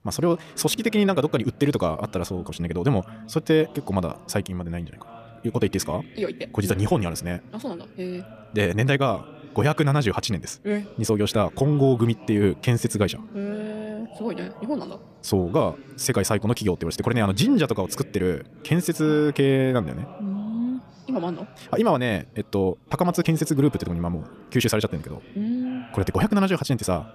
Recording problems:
wrong speed, natural pitch; too fast; 1.7 times normal speed
background chatter; faint; throughout; 2 voices, 20 dB below the speech

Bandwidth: 14.5 kHz